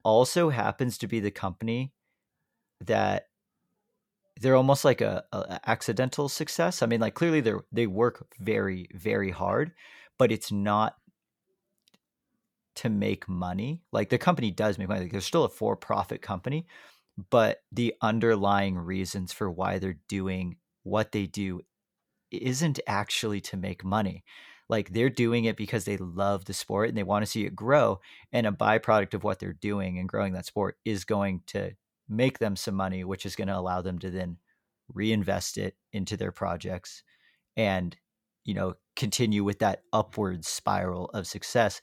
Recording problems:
none

